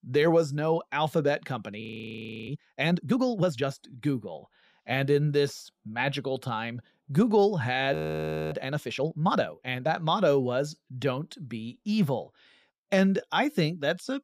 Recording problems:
audio freezing; at 2 s for 0.5 s and at 8 s for 0.5 s

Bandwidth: 15 kHz